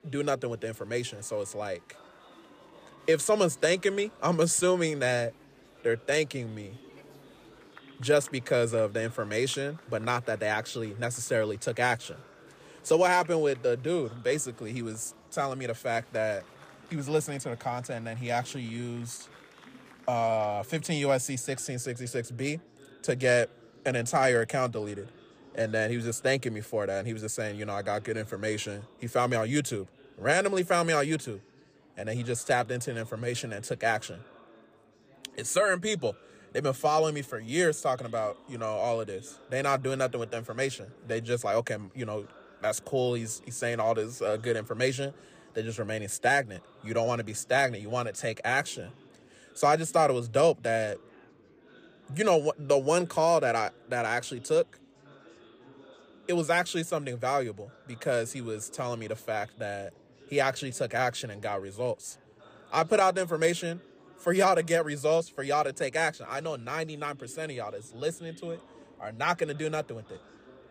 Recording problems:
murmuring crowd; faint; throughout; 25 dB below the speech

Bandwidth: 15 kHz